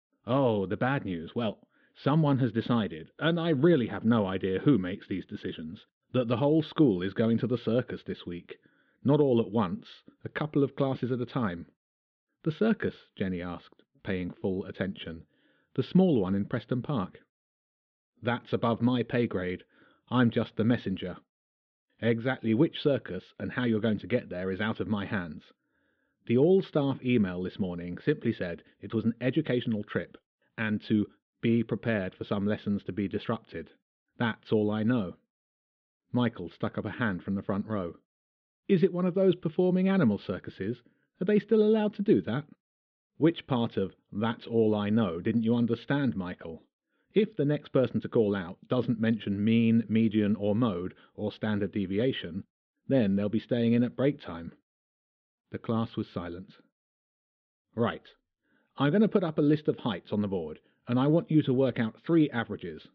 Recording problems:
muffled; very; fading above 3.5 kHz

